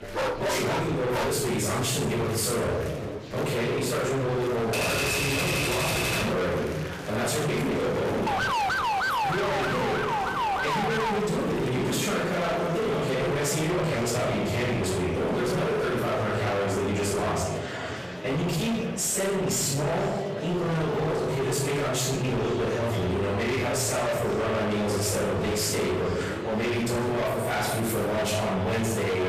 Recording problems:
distortion; heavy; 46% of the sound clipped
room echo; strong; dies away in 0.9 s
off-mic speech; far
echo of what is said; noticeable; from 7.5 s on; 490 ms later, 15 dB below the speech
murmuring crowd; noticeable; throughout; 10 dB below the speech
dog barking; loud; until 1.5 s; peak 1 dB above the speech
keyboard typing; loud; from 4.5 to 6.5 s; peak 4 dB above the speech
siren; loud; from 8.5 to 11 s; peak 2 dB above the speech

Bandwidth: 14.5 kHz